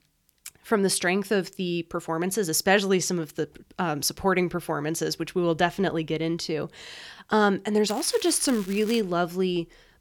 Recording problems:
crackling; noticeable; from 8 to 9 s; 15 dB below the speech

